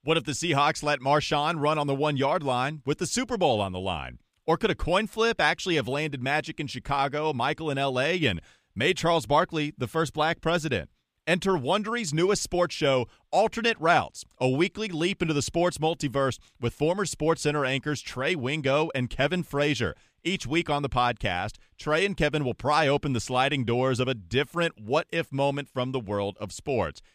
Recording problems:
none

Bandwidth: 15 kHz